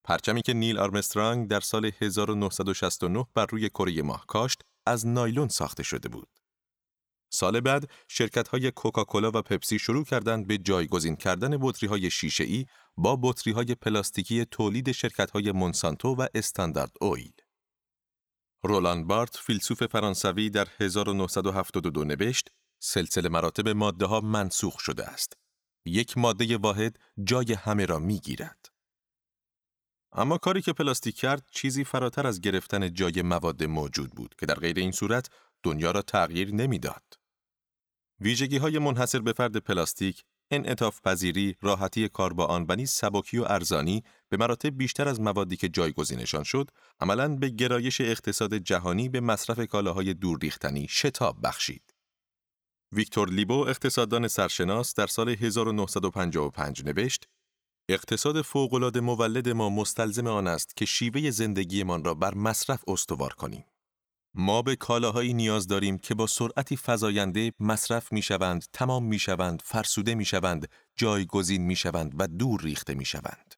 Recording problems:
none

